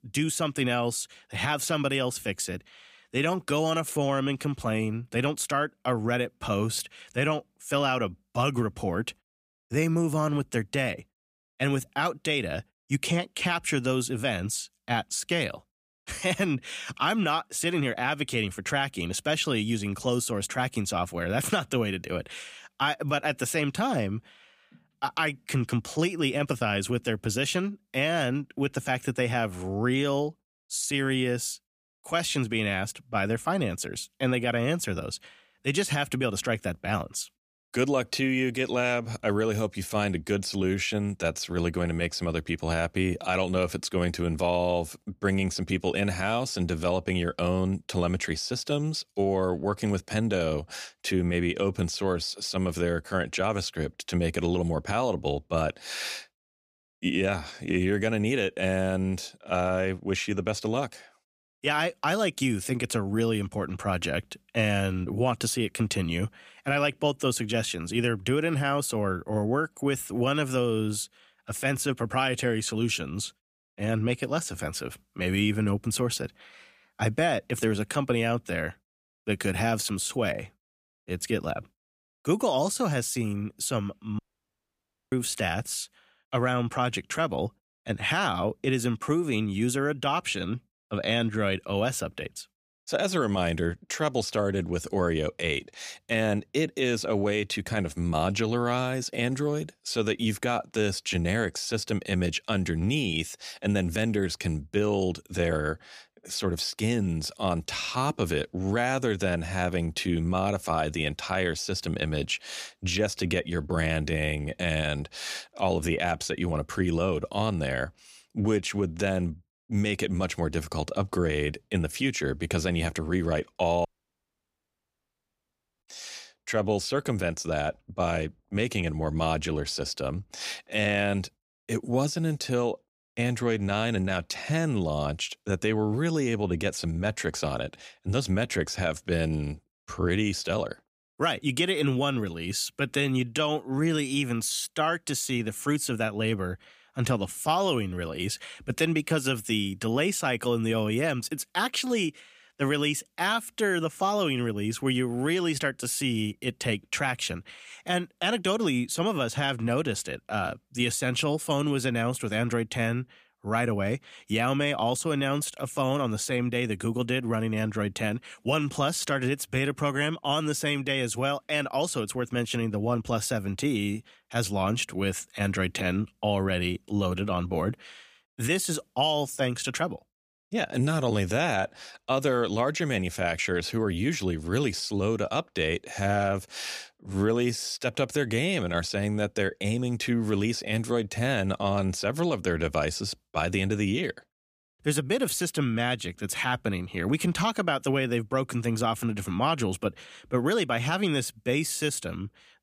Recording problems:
audio cutting out; at 1:24 for 1 s and at 2:04 for 2 s

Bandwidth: 15 kHz